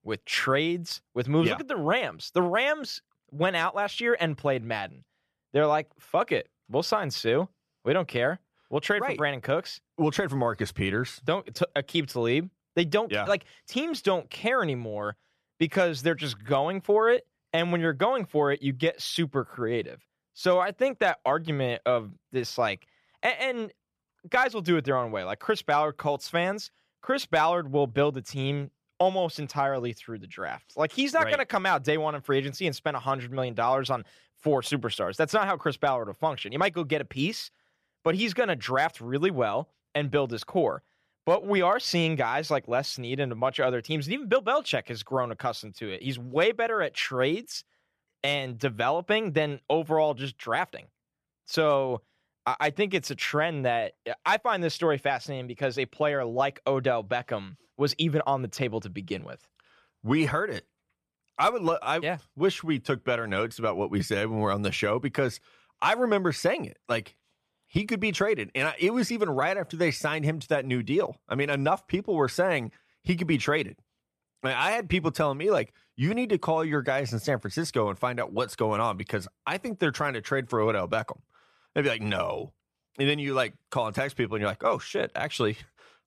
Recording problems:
none

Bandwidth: 14.5 kHz